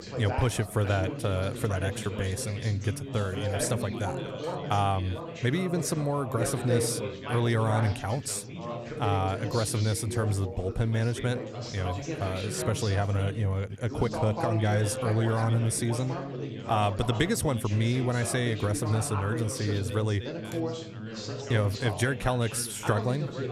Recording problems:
background chatter; loud; throughout; 3 voices, 7 dB below the speech

